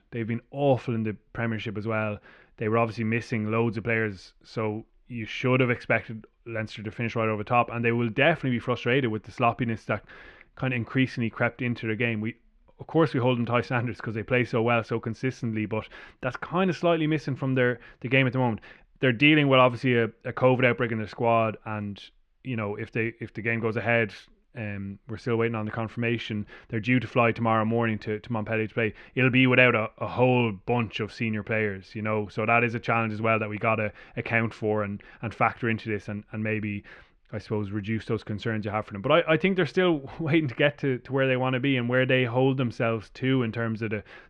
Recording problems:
muffled; slightly; fading above 2.5 kHz

